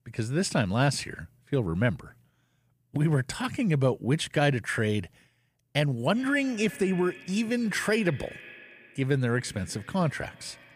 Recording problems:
echo of what is said; faint; from 6 s on; 120 ms later, 20 dB below the speech

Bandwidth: 15 kHz